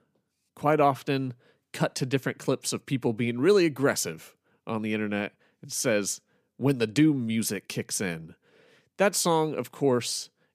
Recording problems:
none

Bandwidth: 15 kHz